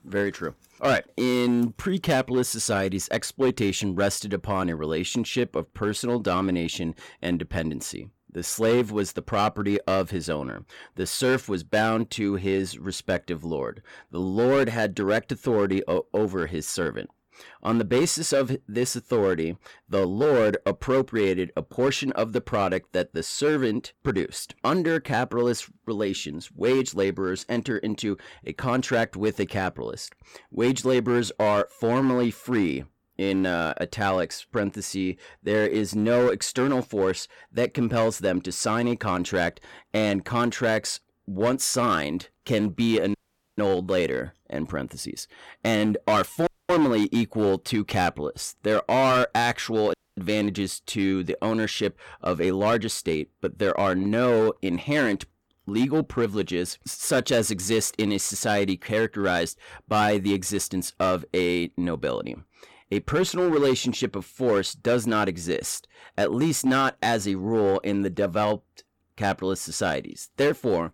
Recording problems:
distortion; slight; 5% of the sound clipped
audio cutting out; at 43 s, at 46 s and at 50 s

